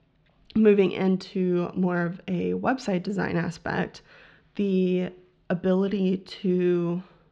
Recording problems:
muffled; slightly; fading above 4 kHz

